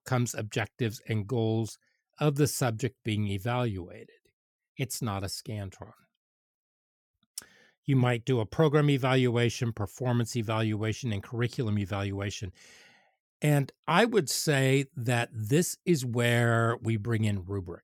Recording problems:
none

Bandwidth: 17.5 kHz